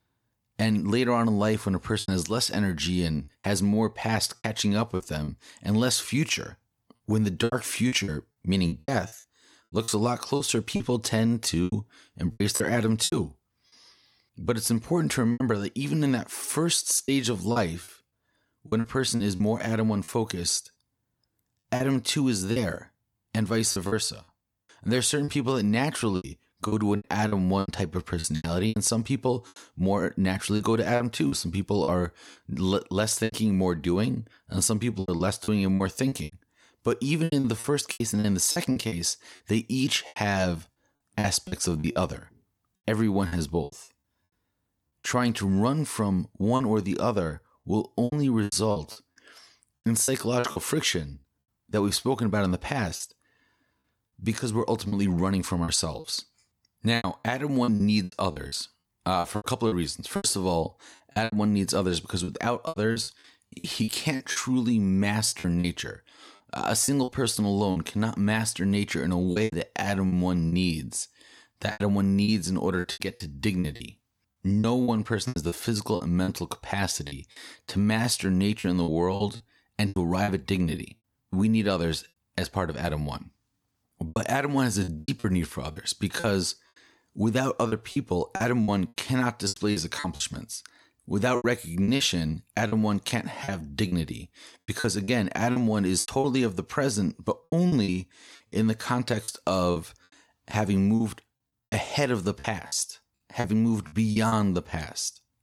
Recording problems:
choppy; very; 10% of the speech affected

